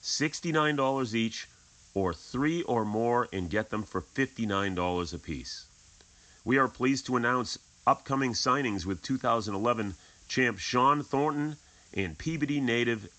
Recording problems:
high frequencies cut off; noticeable; nothing above 8 kHz
hiss; faint; throughout; 25 dB below the speech

